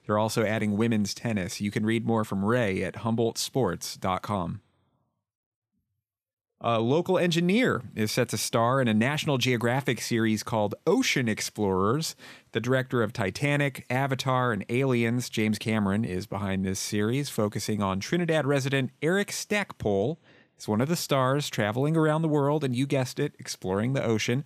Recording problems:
none

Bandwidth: 14.5 kHz